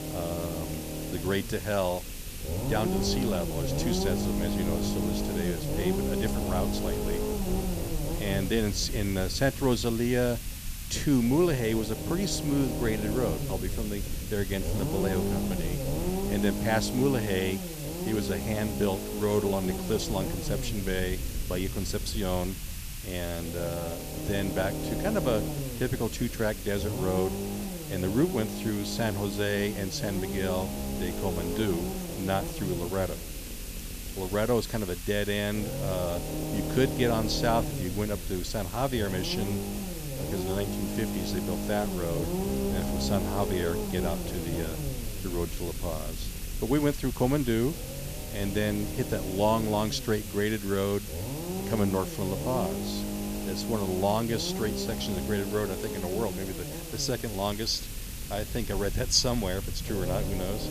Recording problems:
hiss; loud; throughout; 10 dB below the speech
low rumble; loud; throughout; 6 dB below the speech

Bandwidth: 14.5 kHz